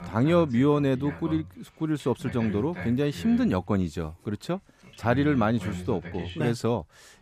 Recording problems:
voice in the background; noticeable; throughout; 15 dB below the speech

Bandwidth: 14.5 kHz